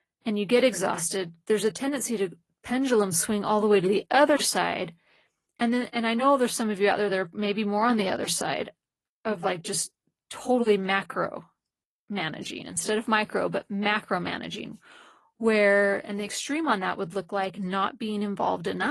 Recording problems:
garbled, watery; slightly; nothing above 11.5 kHz
abrupt cut into speech; at the end

